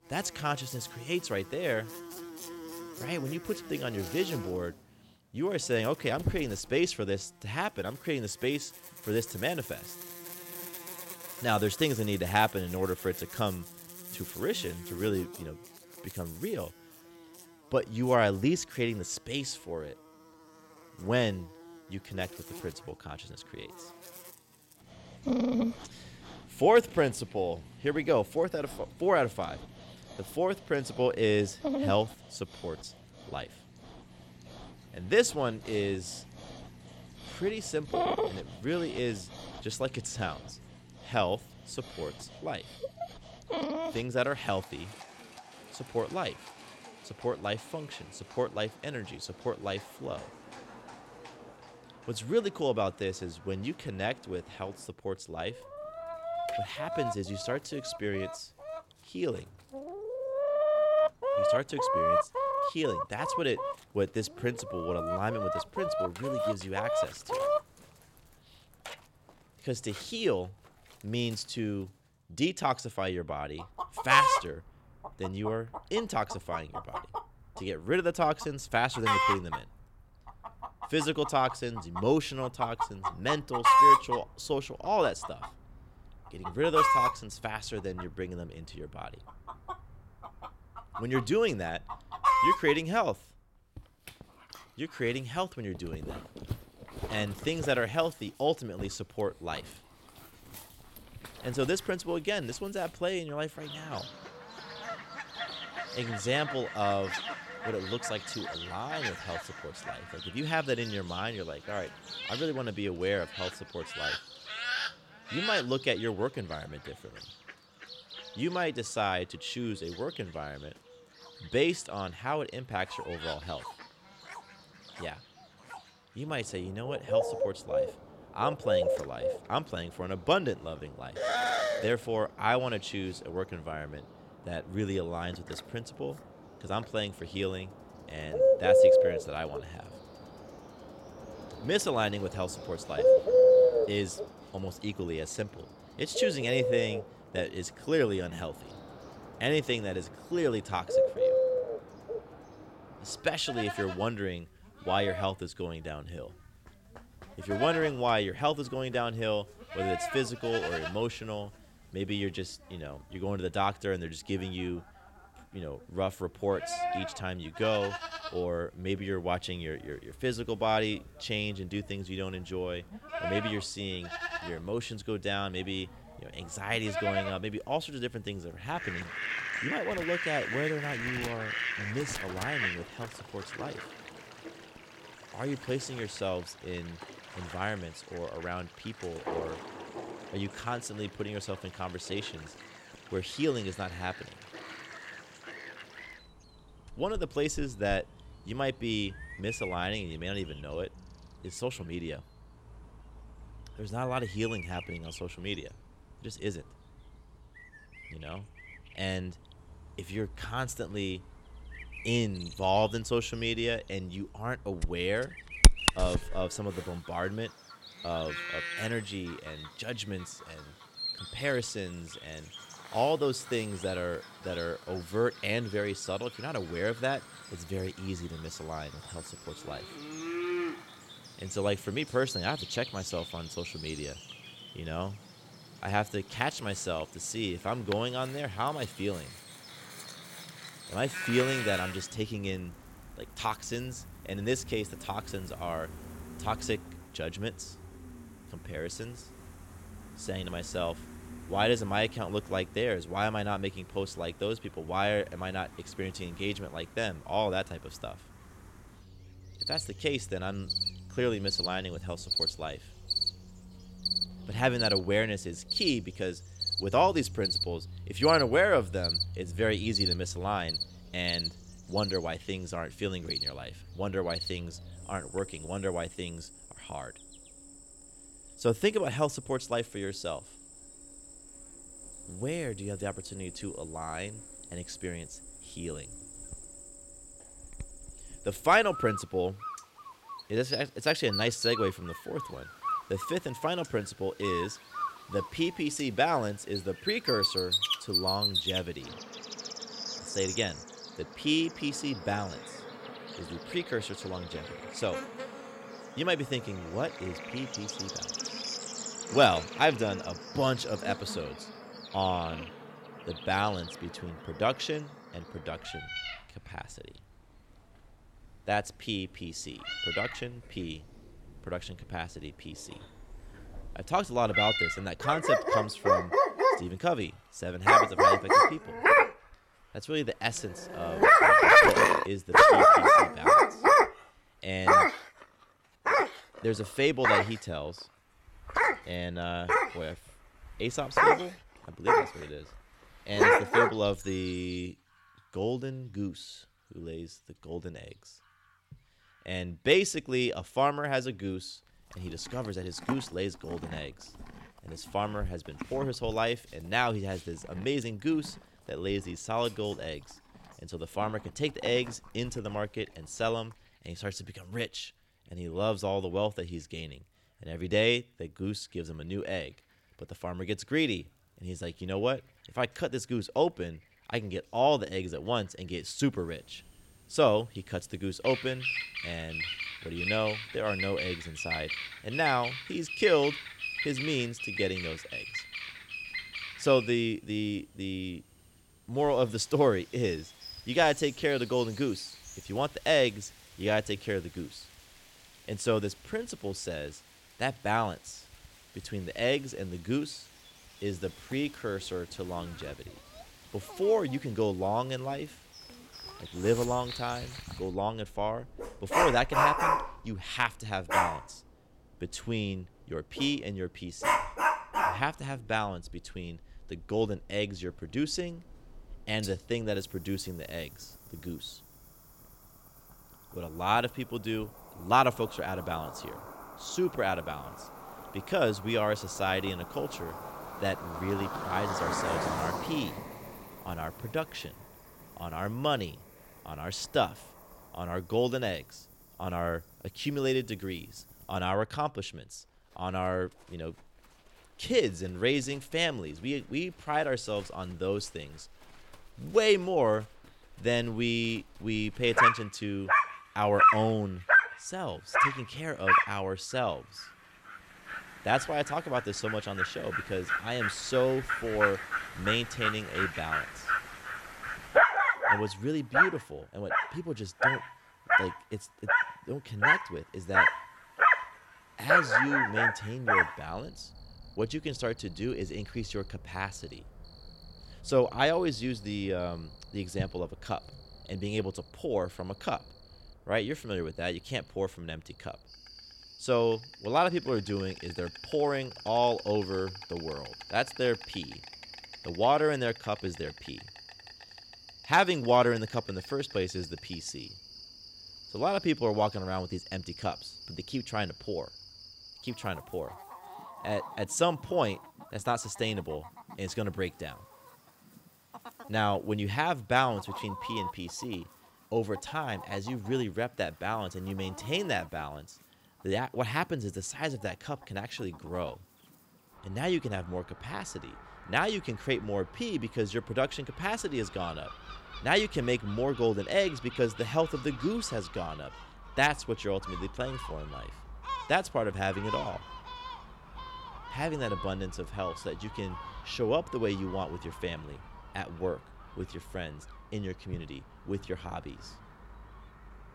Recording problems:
animal sounds; very loud; throughout; 3 dB above the speech

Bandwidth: 16.5 kHz